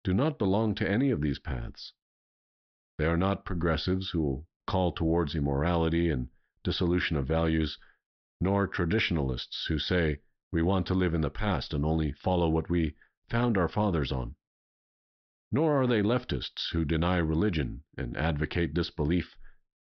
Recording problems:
high frequencies cut off; noticeable; nothing above 5.5 kHz

